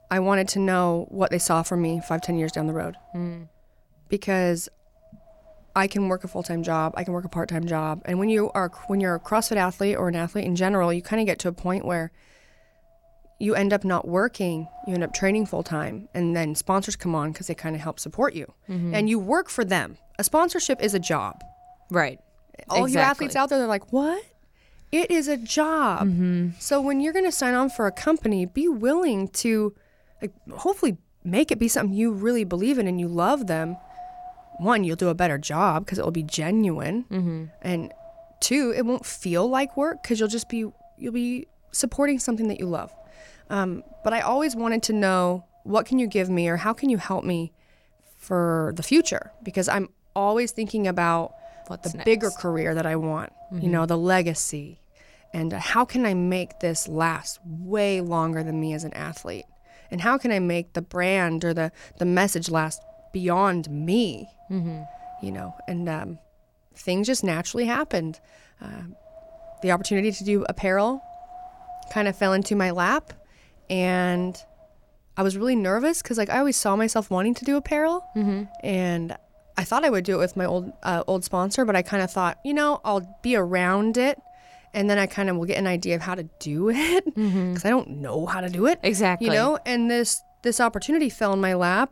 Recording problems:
wind noise on the microphone; occasional gusts; 20 dB below the speech

